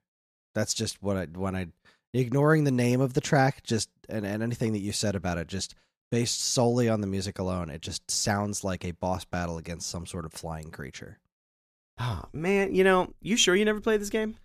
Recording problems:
none

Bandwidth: 14.5 kHz